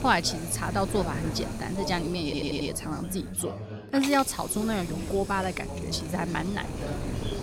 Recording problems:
chatter from many people; loud; throughout; 9 dB below the speech
wind noise on the microphone; occasional gusts; until 3.5 s and from 4 s on; 15 dB below the speech
hiss; noticeable; throughout; 15 dB below the speech
audio stuttering; at 2 s

